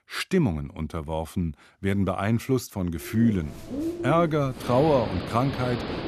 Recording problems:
animal sounds; loud; from 3 s on; 8 dB below the speech

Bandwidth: 14.5 kHz